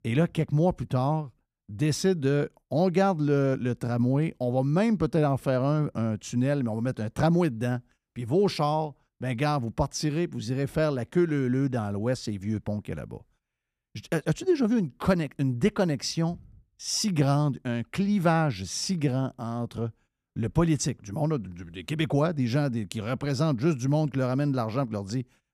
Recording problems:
none

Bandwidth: 14.5 kHz